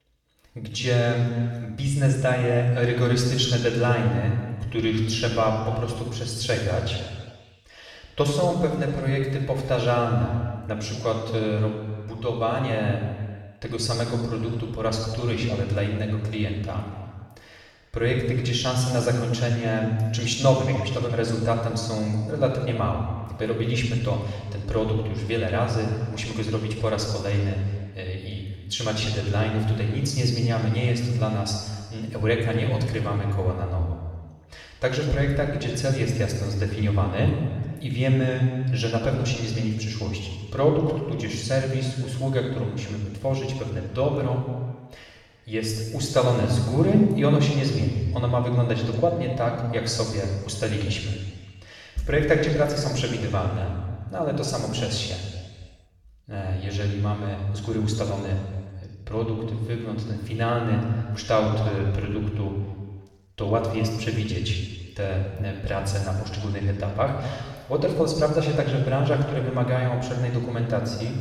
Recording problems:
off-mic speech; far
room echo; noticeable; dies away in 1.5 s

